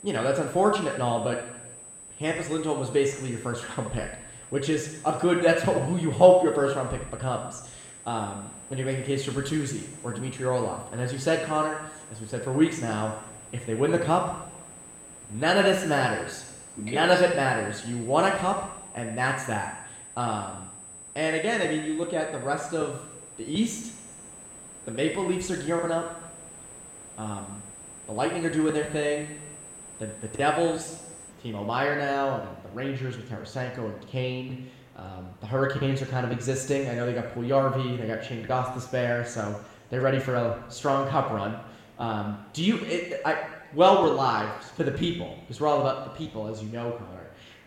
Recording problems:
room echo; noticeable; dies away in 1 s
off-mic speech; somewhat distant
high-pitched whine; noticeable; until 31 s; 8 kHz, 15 dB below the speech
hiss; faint; throughout; 25 dB below the speech

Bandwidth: 16 kHz